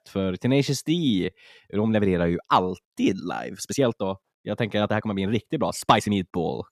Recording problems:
uneven, jittery; strongly; from 1 to 6 s

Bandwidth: 14 kHz